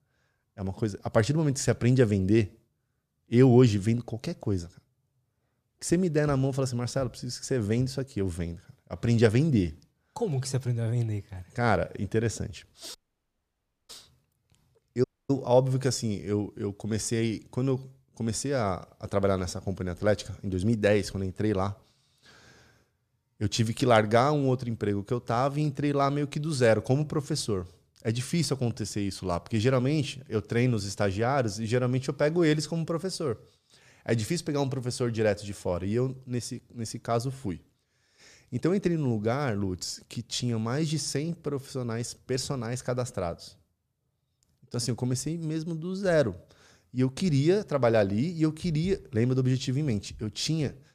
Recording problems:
audio cutting out; at 13 s for 1 s and at 15 s

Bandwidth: 14.5 kHz